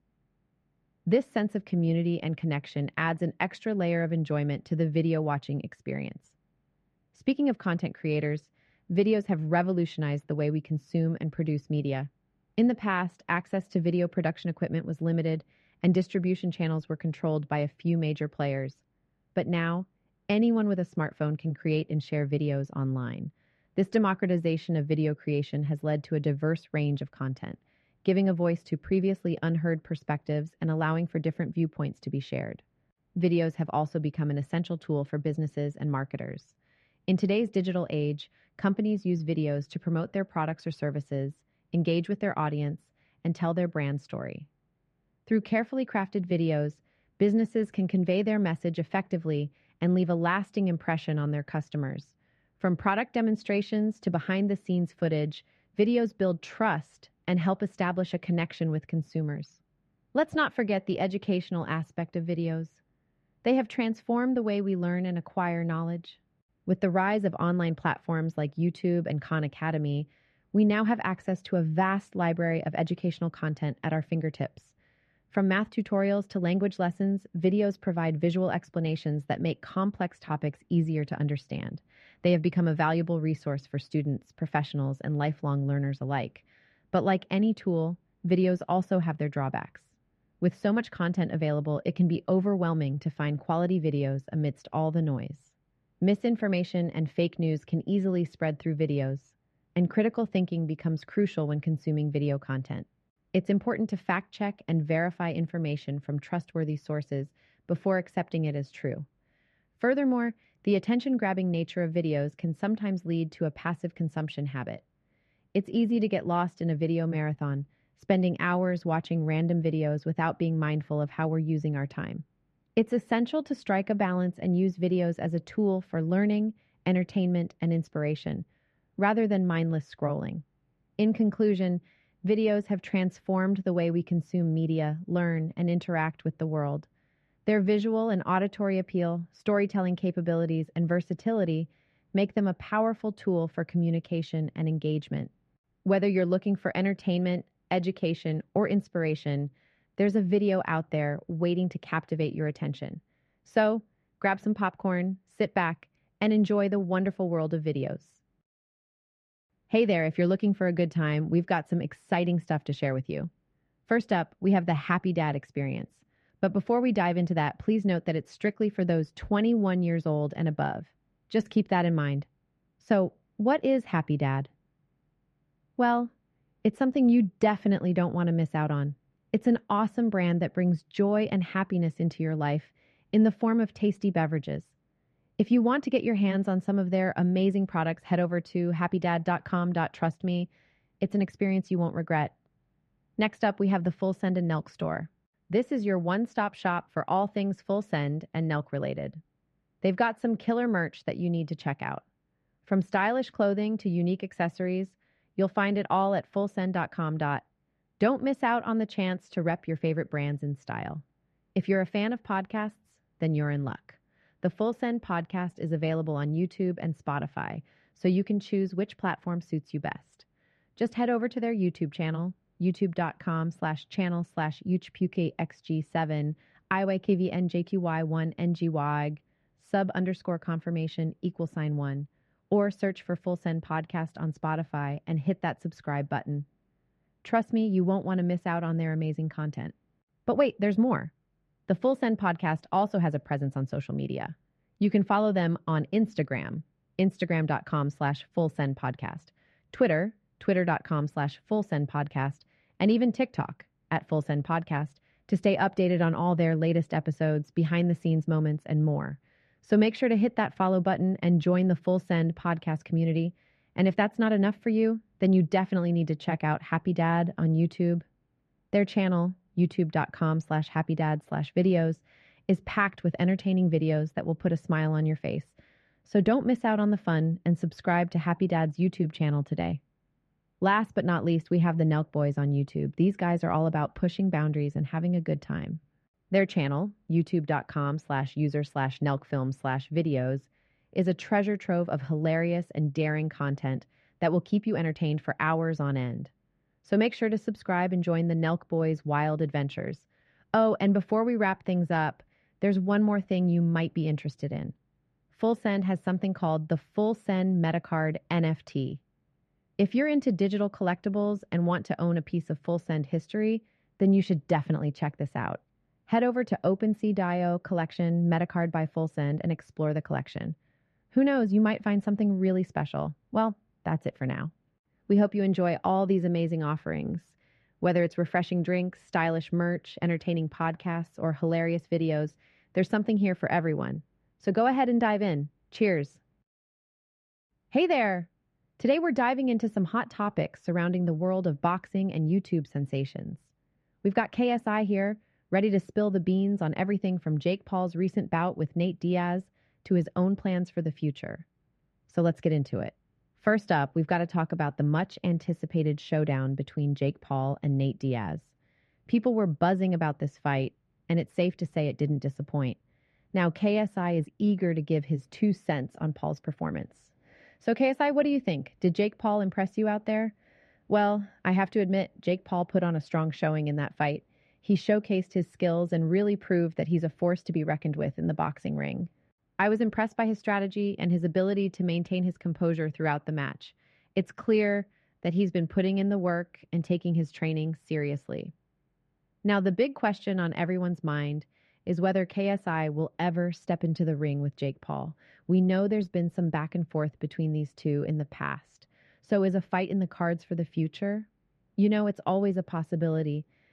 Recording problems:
muffled; very; fading above 2 kHz

